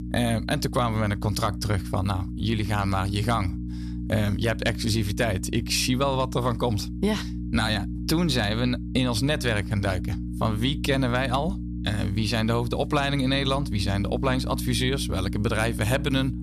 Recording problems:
electrical hum; noticeable; throughout; 60 Hz, 15 dB below the speech

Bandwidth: 14 kHz